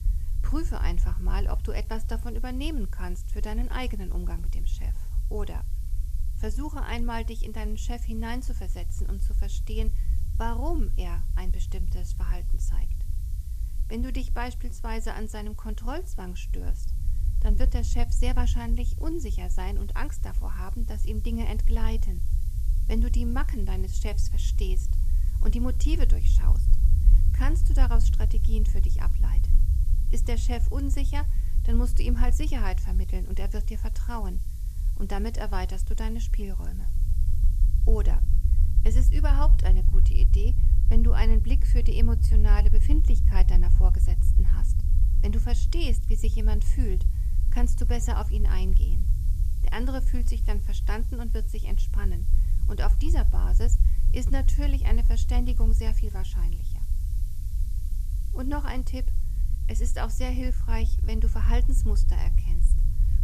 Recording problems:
hiss; noticeable; throughout; 15 dB below the speech
low rumble; noticeable; throughout; 10 dB below the speech

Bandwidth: 14.5 kHz